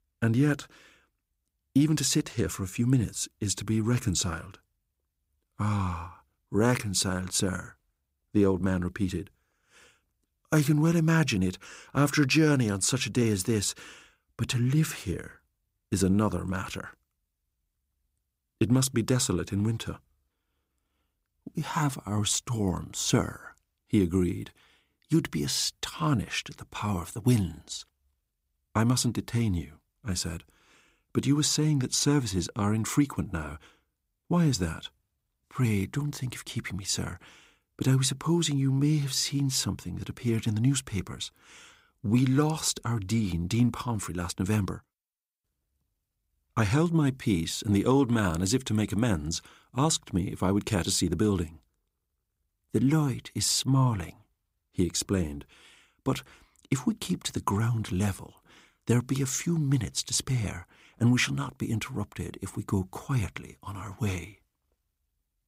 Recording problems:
none

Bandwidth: 15.5 kHz